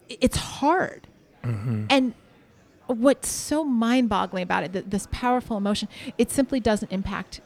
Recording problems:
murmuring crowd; faint; throughout; 30 dB below the speech

